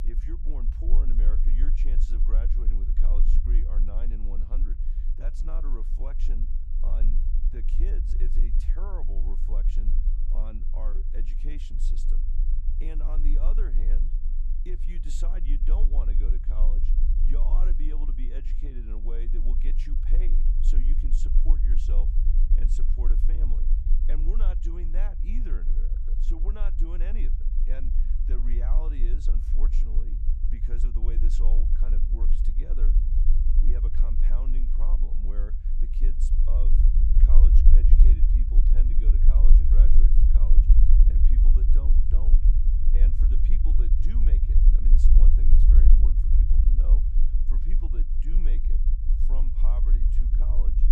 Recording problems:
low rumble; loud; throughout; 1 dB below the speech

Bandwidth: 15 kHz